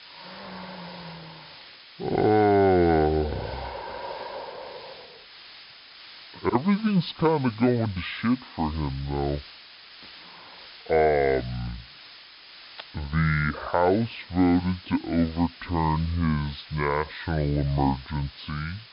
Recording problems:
wrong speed and pitch; too slow and too low; 0.6 times normal speed
high frequencies cut off; noticeable; nothing above 5.5 kHz
hiss; noticeable; throughout; 20 dB below the speech

